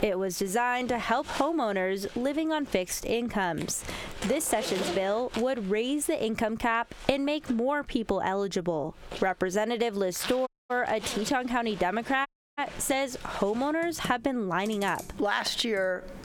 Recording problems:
squashed, flat; heavily, background pumping
household noises; noticeable; throughout; 15 dB below the speech
audio cutting out; at 10 s and at 12 s

